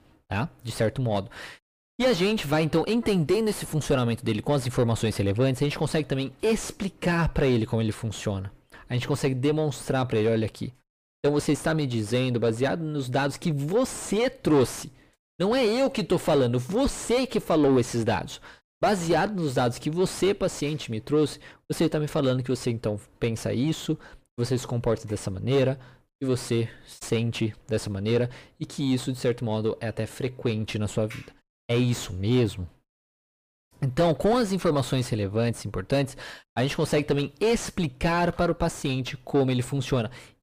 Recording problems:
distortion; heavy; 6 dB below the speech

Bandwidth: 15 kHz